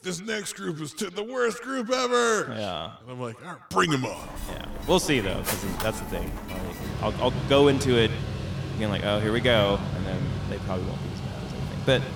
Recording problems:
echo of what is said; noticeable; throughout; 120 ms later, 15 dB below the speech
machinery noise; loud; from 4 s on; 6 dB below the speech

